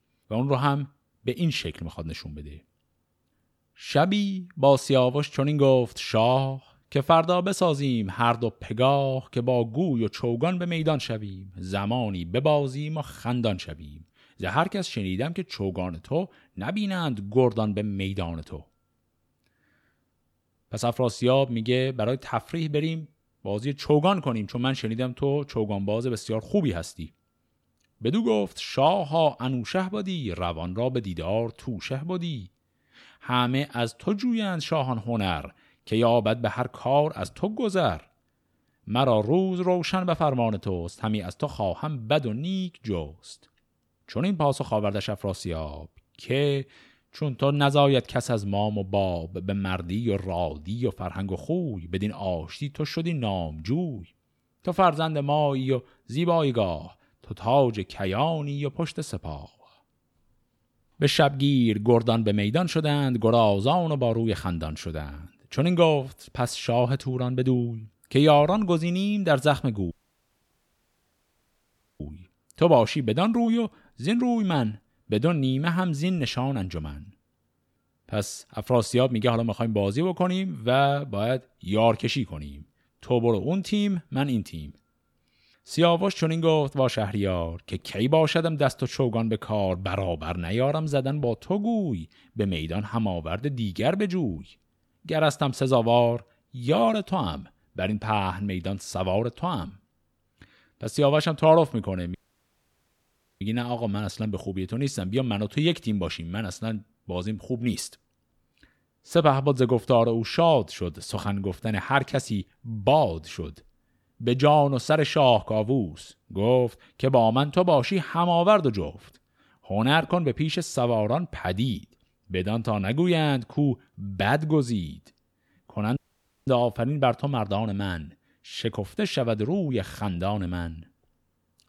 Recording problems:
audio cutting out; at 1:10 for 2 s, at 1:42 for 1.5 s and at 2:06 for 0.5 s

